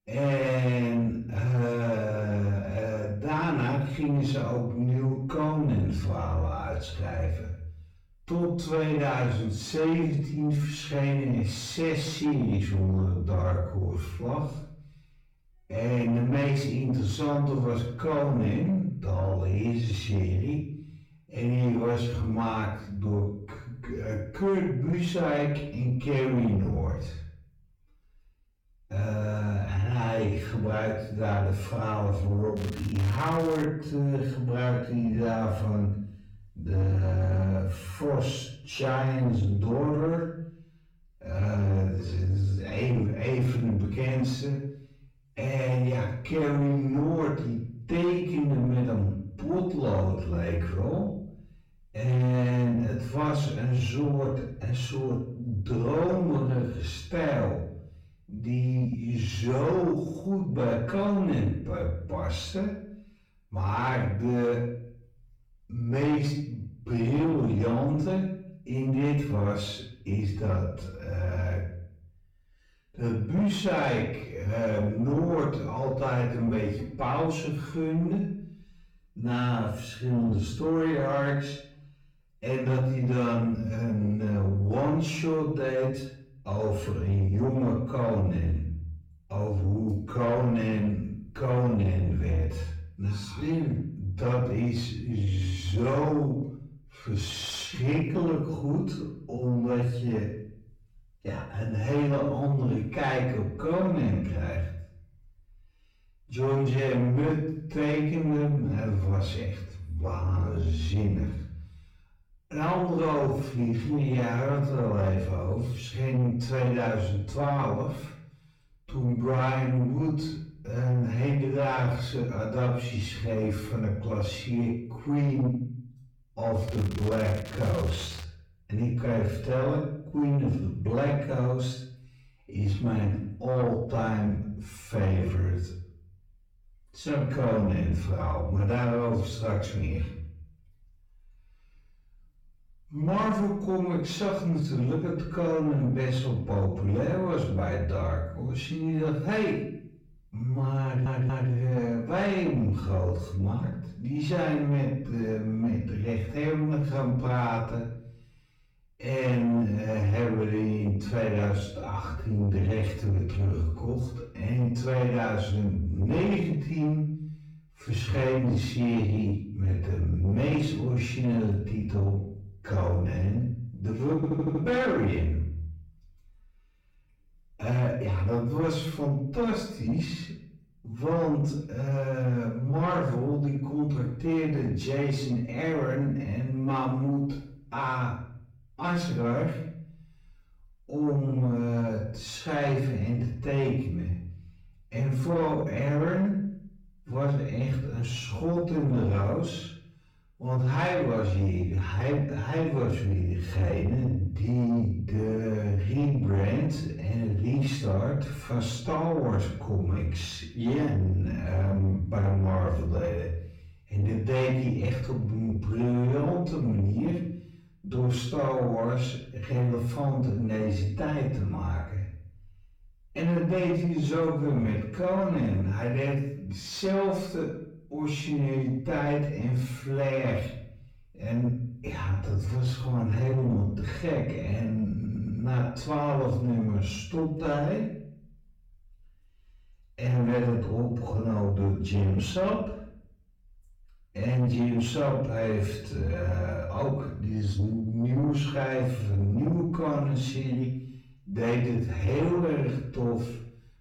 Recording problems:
off-mic speech; far
wrong speed, natural pitch; too slow; 0.5 times normal speed
room echo; noticeable; dies away in 0.6 s
distortion; slight; 10 dB below the speech
crackling; noticeable; from 33 to 34 s and from 2:07 to 2:08; 15 dB below the speech
audio stuttering; at 2:31, at 2:54 and at 3:55

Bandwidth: 18 kHz